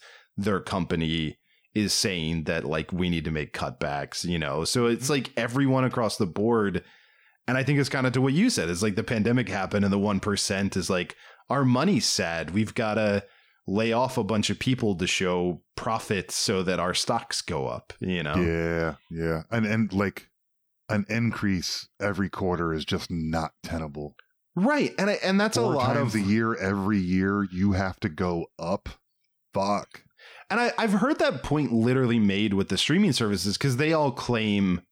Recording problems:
none

